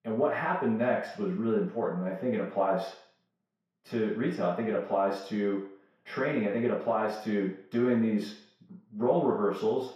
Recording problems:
off-mic speech; far
room echo; noticeable; dies away in 0.6 s

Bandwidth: 14.5 kHz